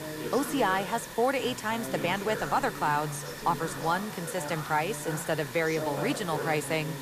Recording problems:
background chatter; loud; throughout; 2 voices, 9 dB below the speech
hiss; noticeable; throughout; 10 dB below the speech

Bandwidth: 14.5 kHz